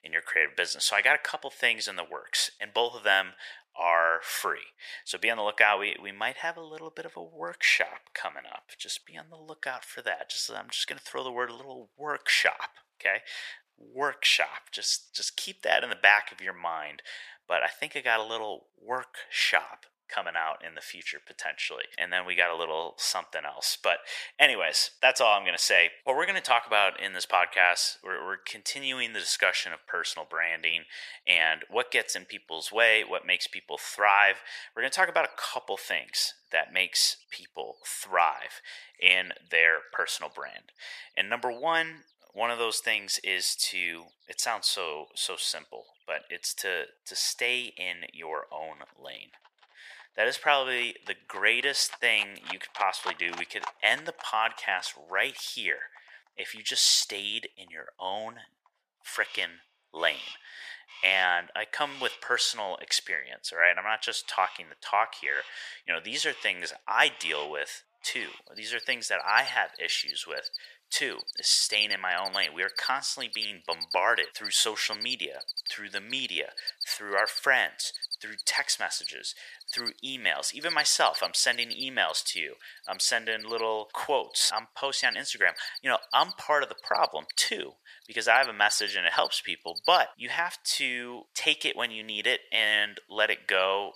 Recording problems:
thin; very; fading below 800 Hz
animal sounds; noticeable; throughout; 10 dB below the speech

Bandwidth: 14.5 kHz